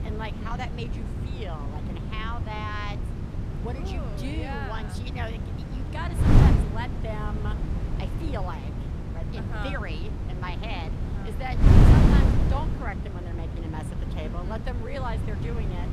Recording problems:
wind noise on the microphone; heavy; as loud as the speech
low rumble; faint; throughout; 20 dB below the speech

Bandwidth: 14 kHz